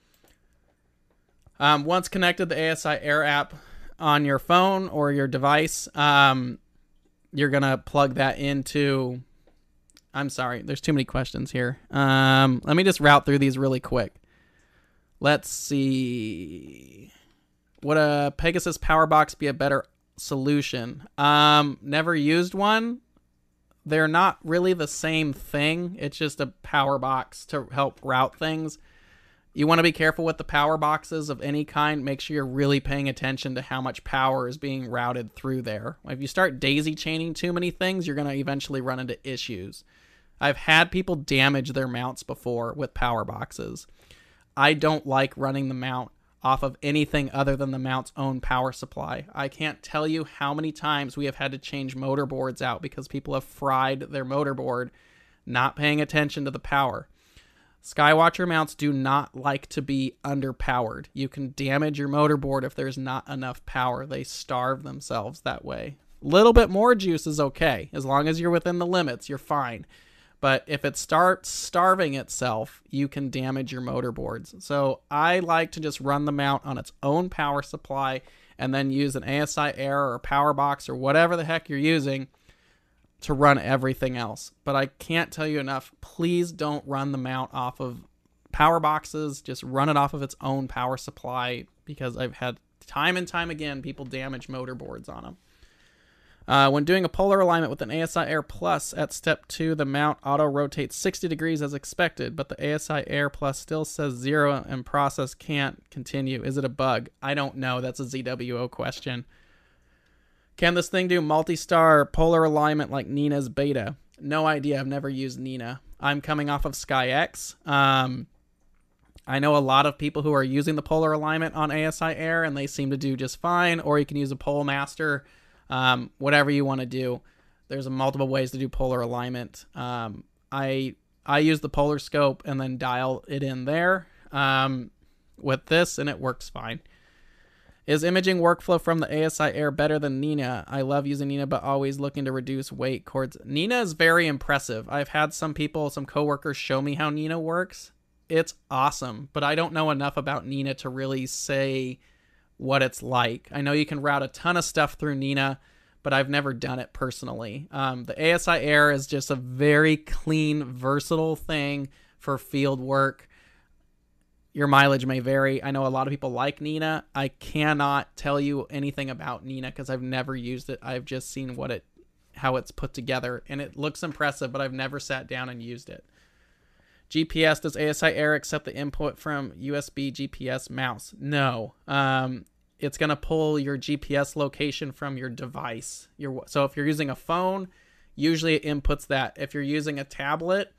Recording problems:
none

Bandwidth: 14.5 kHz